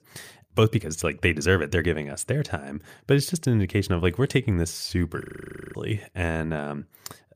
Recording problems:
audio freezing; at 5 s for 0.5 s

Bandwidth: 15 kHz